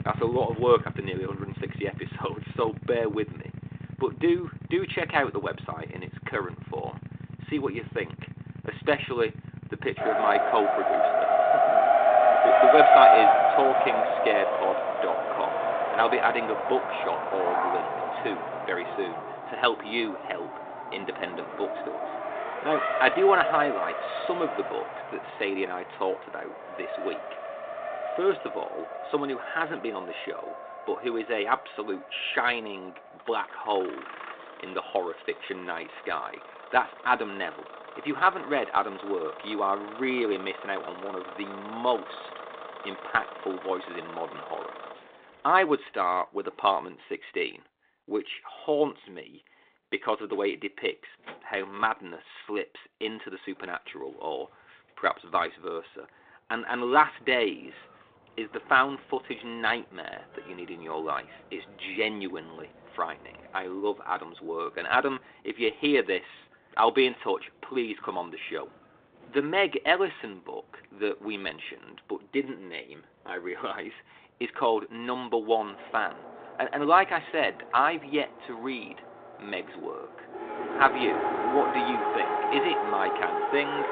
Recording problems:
phone-call audio; nothing above 3.5 kHz
traffic noise; very loud; throughout; 2 dB above the speech

